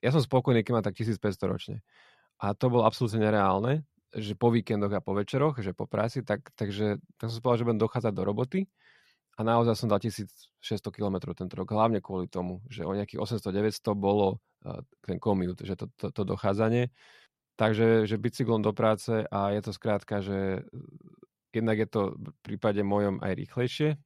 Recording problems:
none

